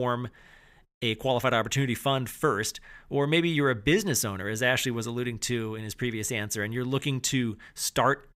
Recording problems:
abrupt cut into speech; at the start

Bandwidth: 15.5 kHz